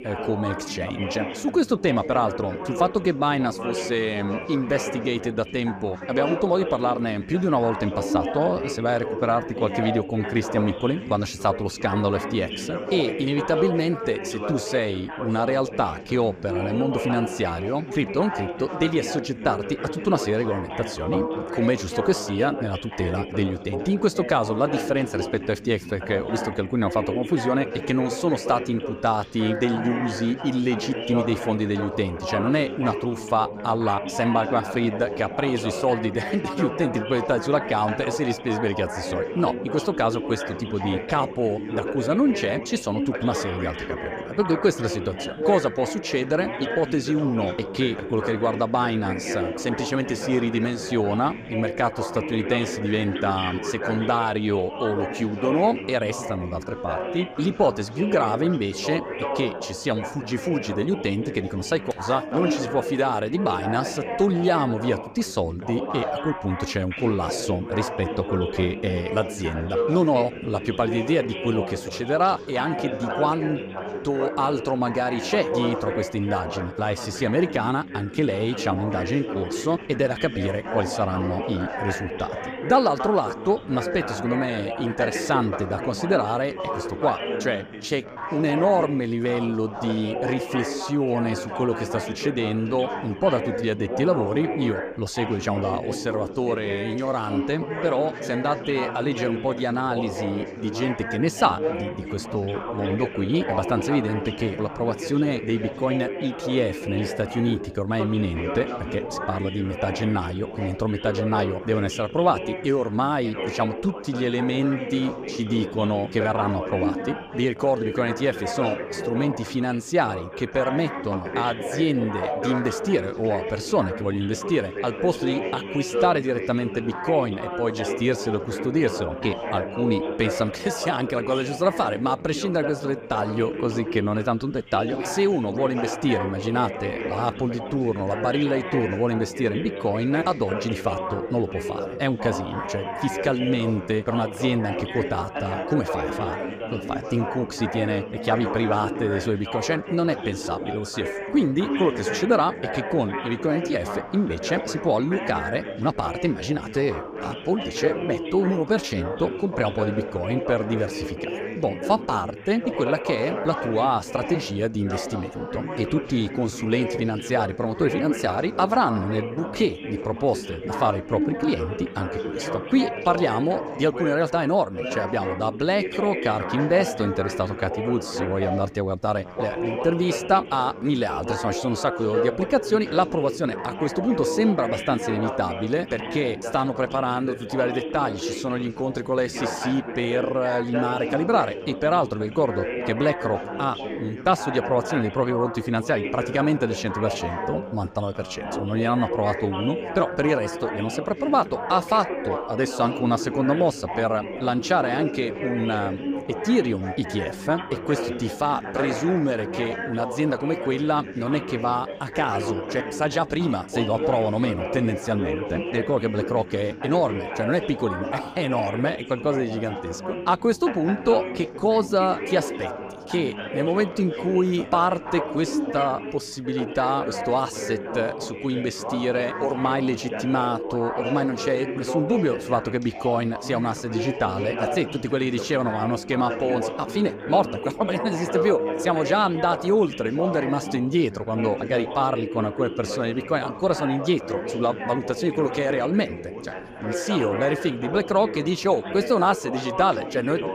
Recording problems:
background chatter; loud; throughout; 4 voices, 6 dB below the speech

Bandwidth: 15 kHz